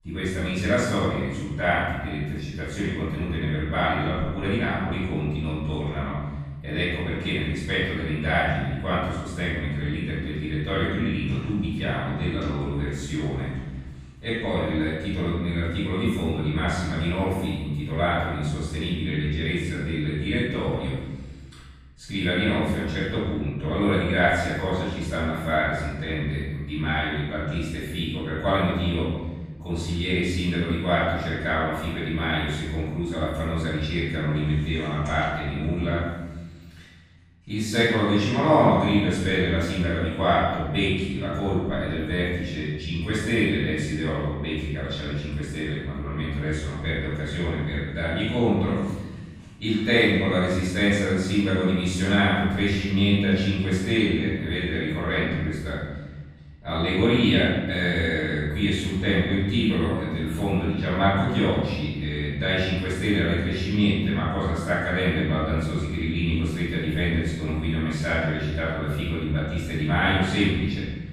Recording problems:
room echo; strong; dies away in 1.3 s
off-mic speech; far

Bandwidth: 15 kHz